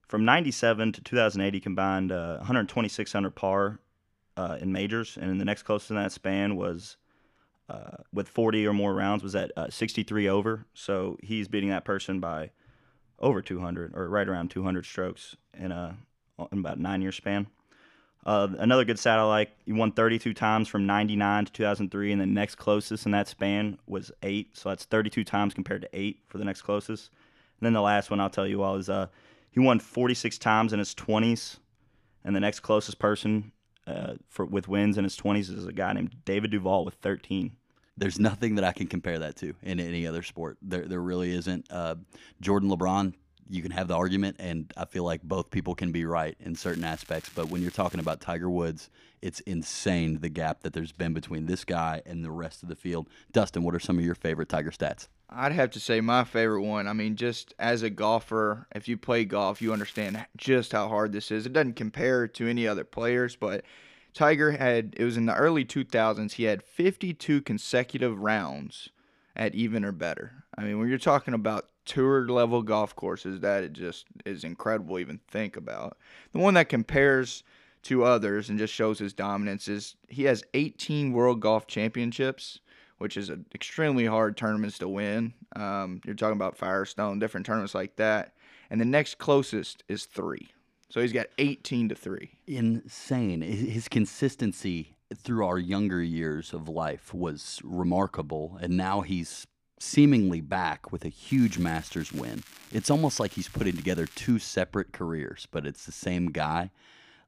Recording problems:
crackling; faint; from 47 to 48 s, at 1:00 and from 1:41 to 1:44; 20 dB below the speech

